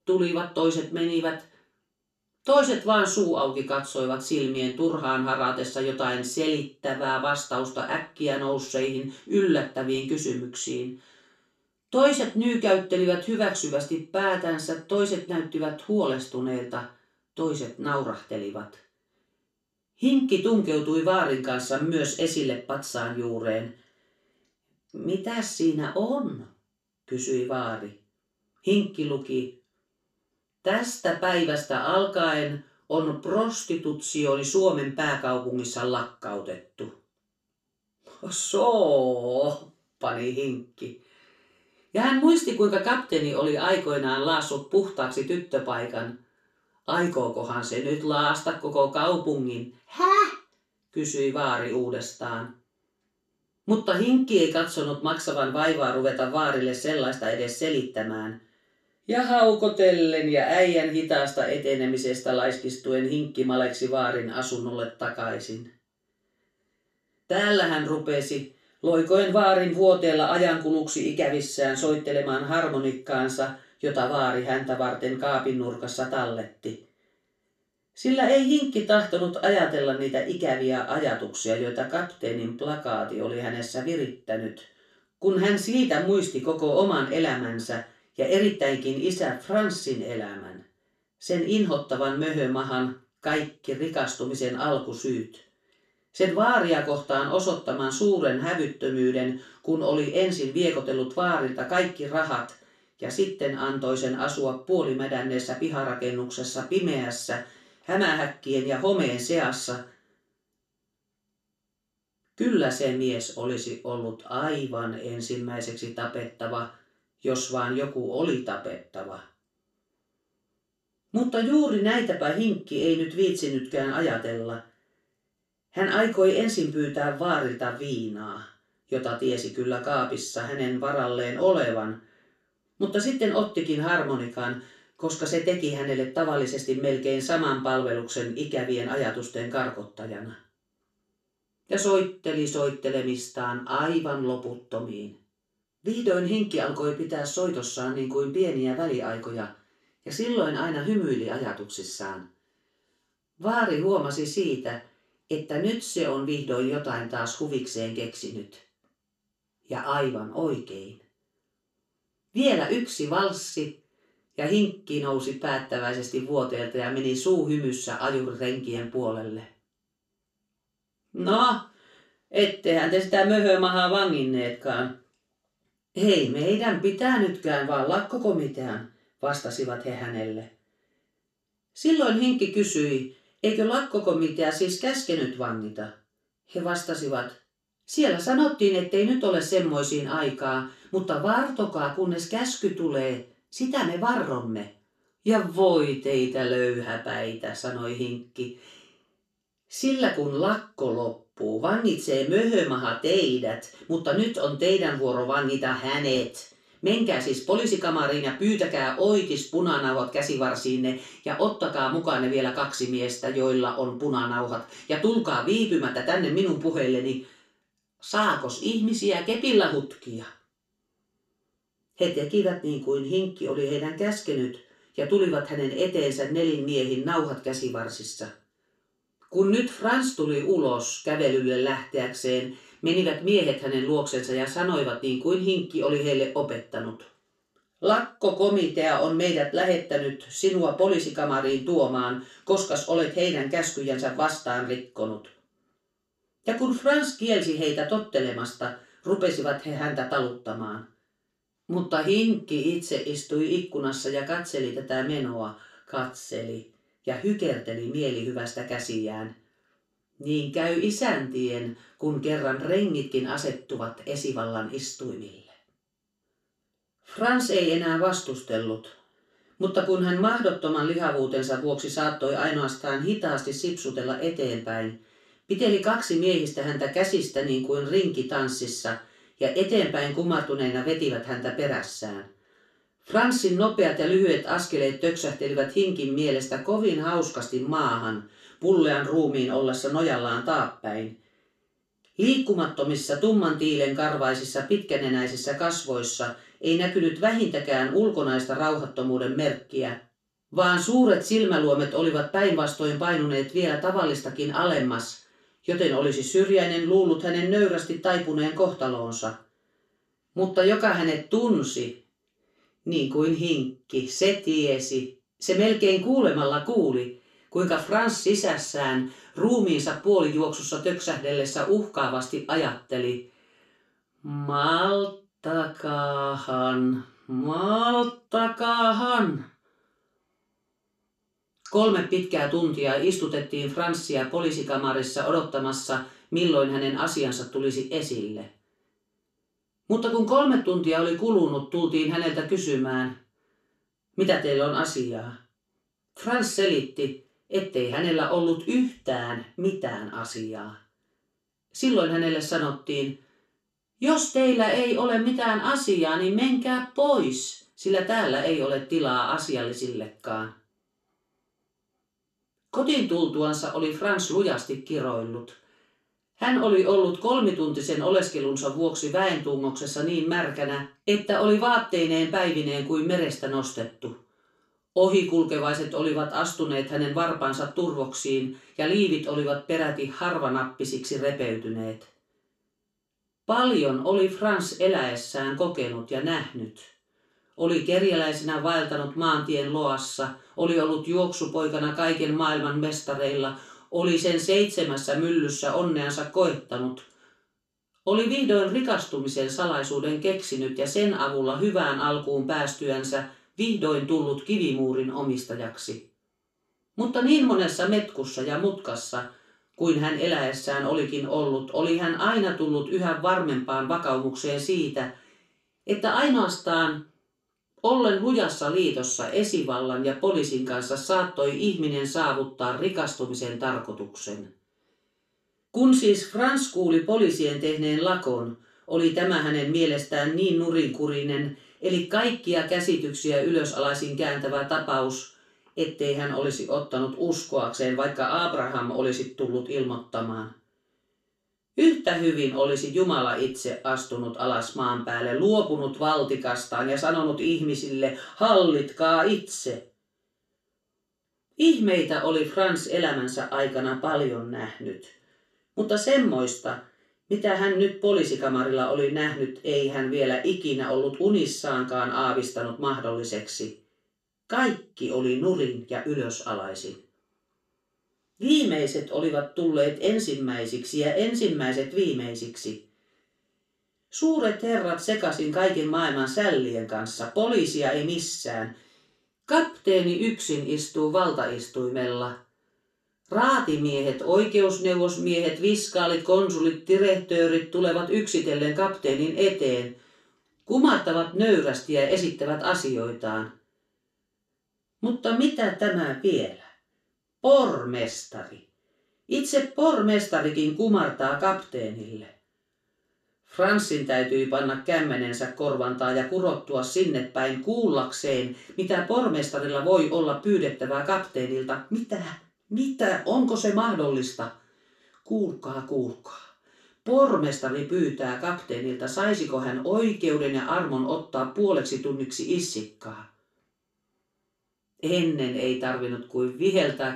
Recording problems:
off-mic speech; far
room echo; slight; dies away in 0.3 s

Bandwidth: 13.5 kHz